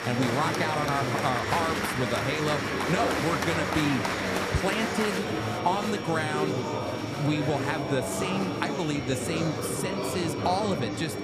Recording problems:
murmuring crowd; very loud; throughout; as loud as the speech
high-pitched whine; noticeable; throughout; 2.5 kHz, 15 dB below the speech

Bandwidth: 14.5 kHz